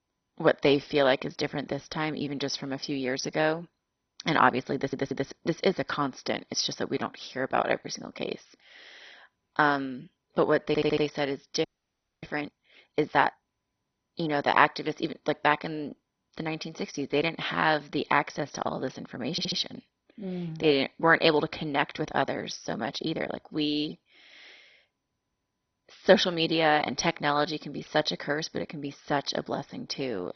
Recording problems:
garbled, watery; badly; nothing above 6 kHz
audio stuttering; at 5 s, at 11 s and at 19 s
audio freezing; at 12 s for 0.5 s

